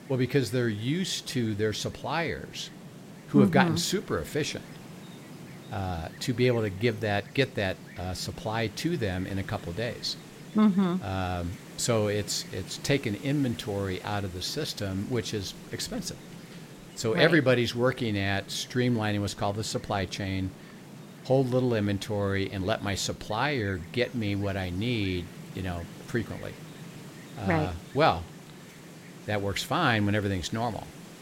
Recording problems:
wind noise on the microphone; occasional gusts; 20 dB below the speech

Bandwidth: 16 kHz